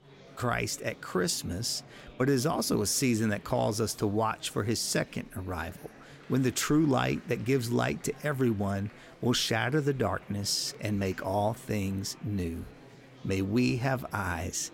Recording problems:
murmuring crowd; faint; throughout; 20 dB below the speech

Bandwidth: 16 kHz